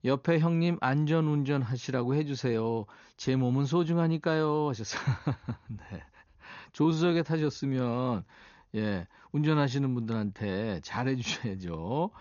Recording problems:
high frequencies cut off; noticeable; nothing above 6.5 kHz

